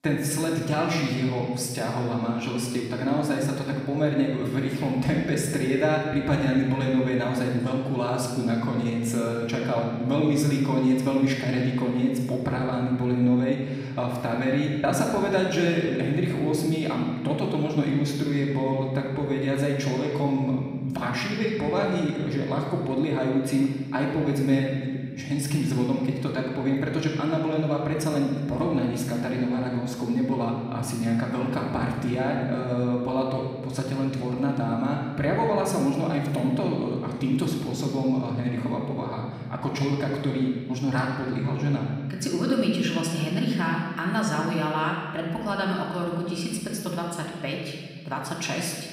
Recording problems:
off-mic speech; far
room echo; noticeable; dies away in 1.6 s

